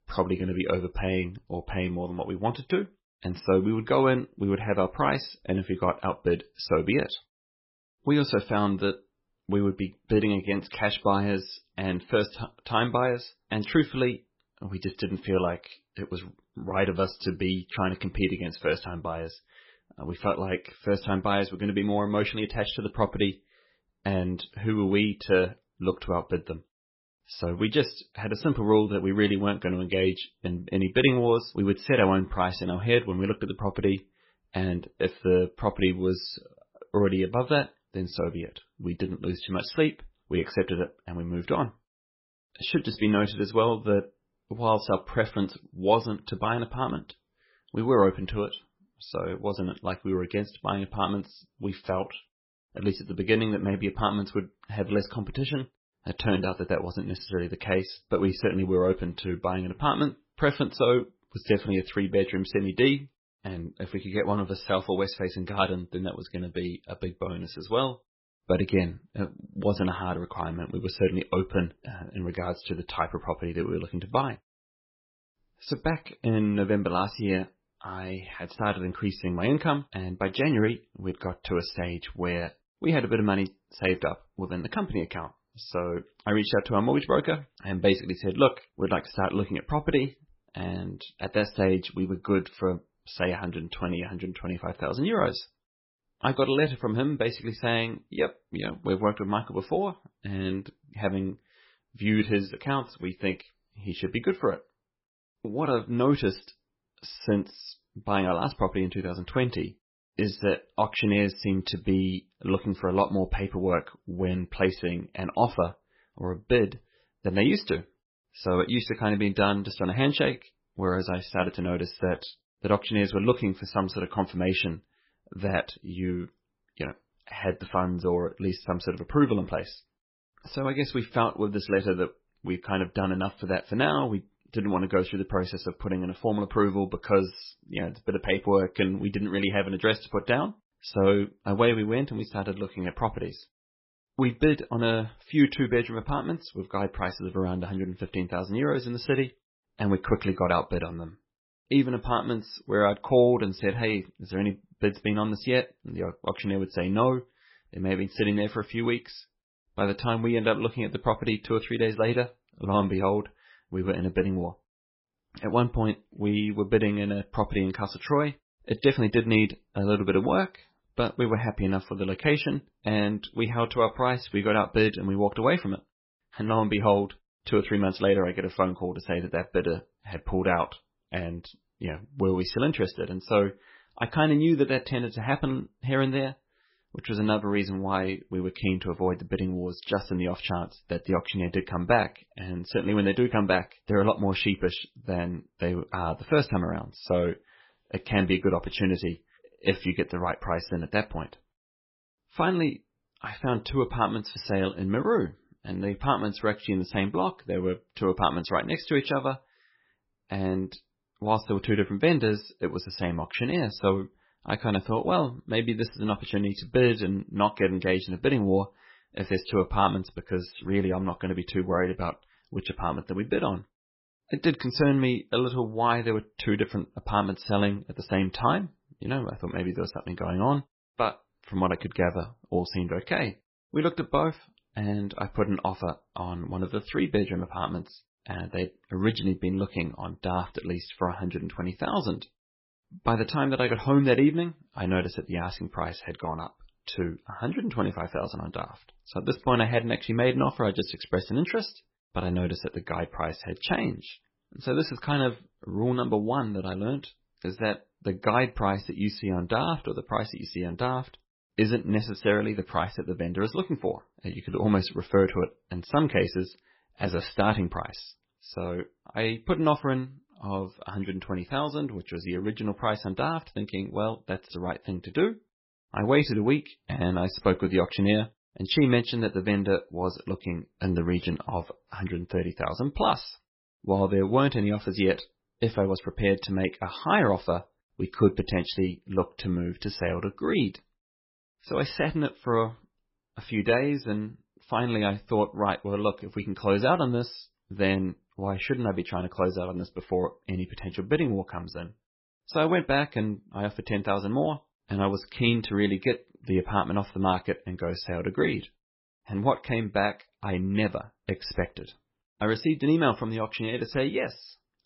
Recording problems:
garbled, watery; badly; nothing above 5.5 kHz

